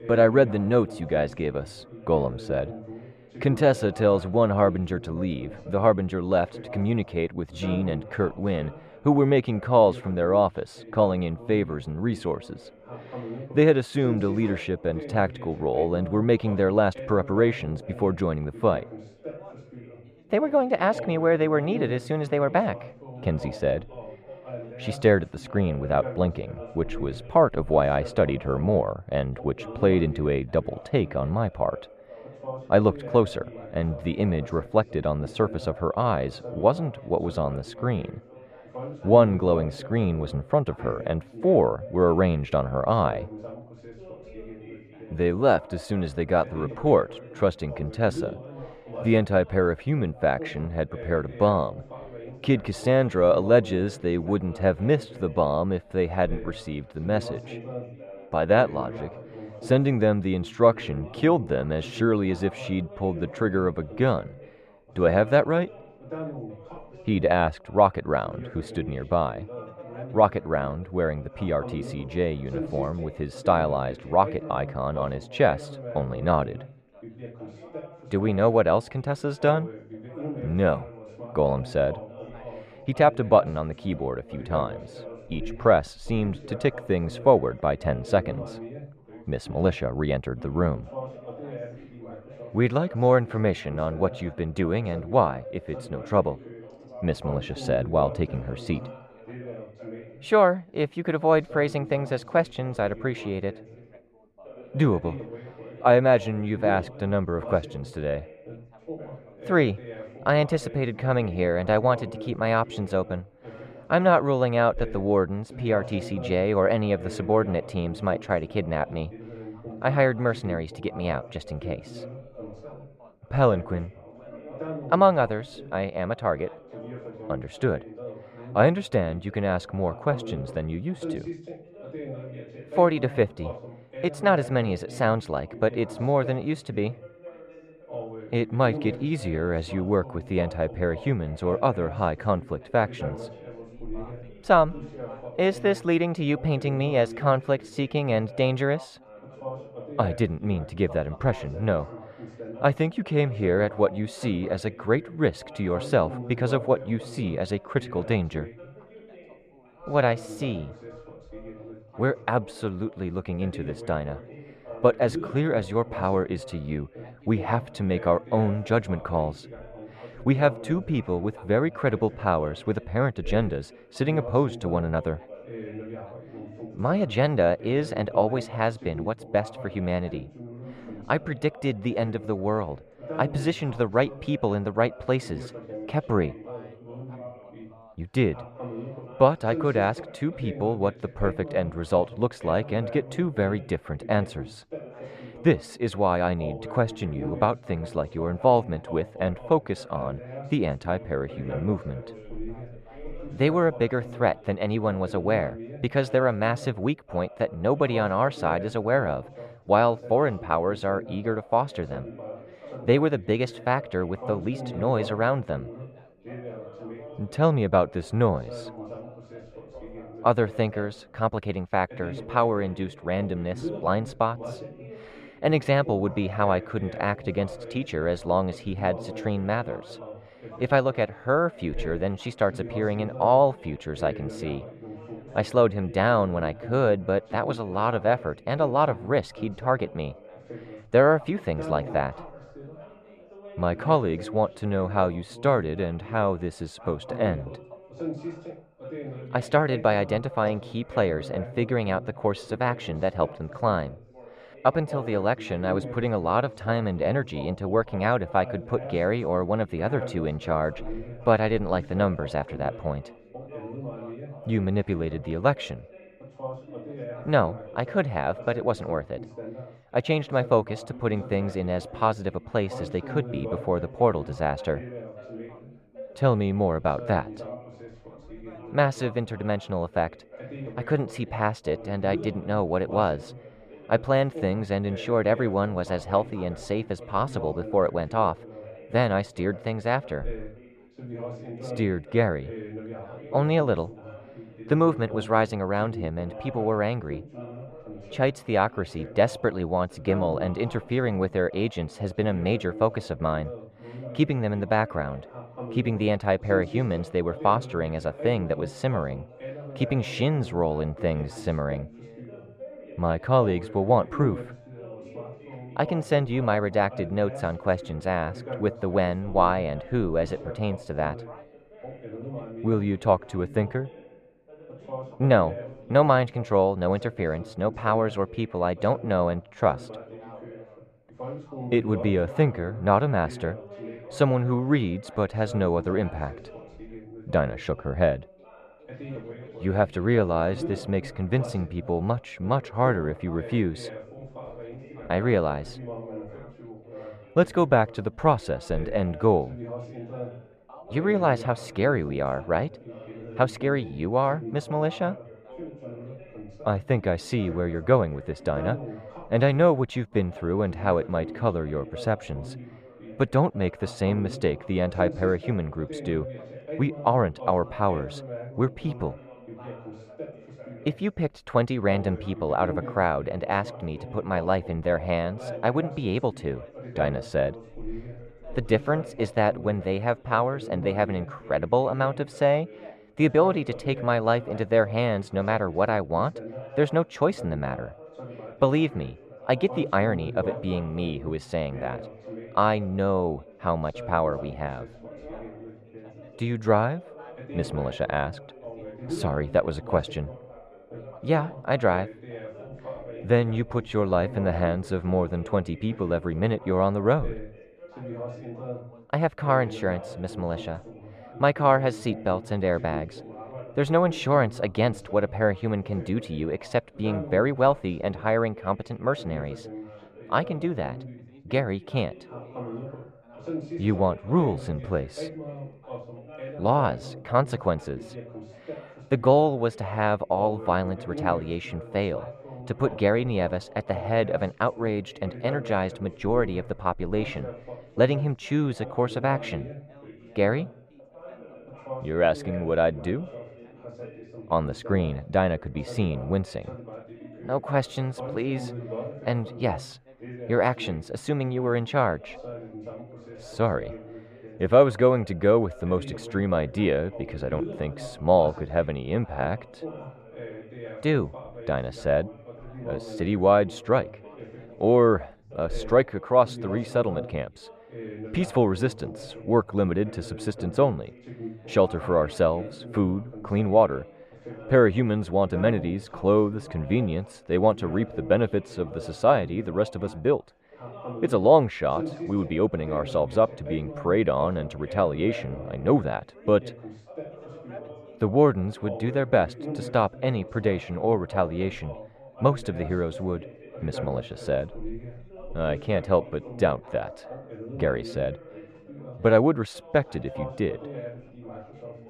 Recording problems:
muffled; slightly; fading above 2.5 kHz
background chatter; noticeable; throughout; 3 voices, 15 dB below the speech

